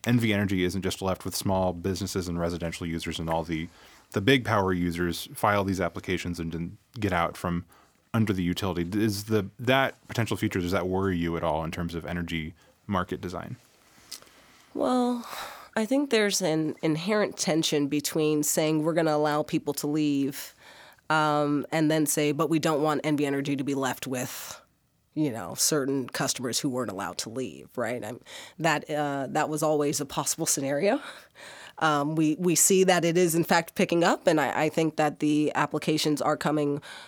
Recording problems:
none

